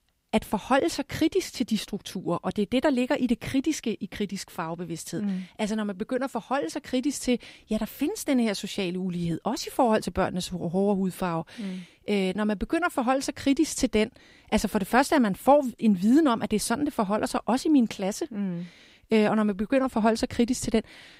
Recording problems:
none

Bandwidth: 15.5 kHz